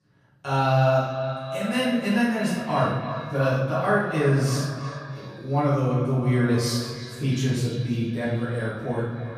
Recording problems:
echo of what is said; strong; throughout; 320 ms later, 10 dB below the speech
off-mic speech; far
room echo; noticeable; dies away in 1.6 s

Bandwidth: 14.5 kHz